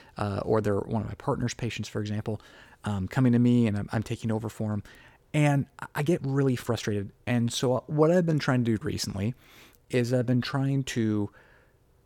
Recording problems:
uneven, jittery; strongly; from 6 to 11 s

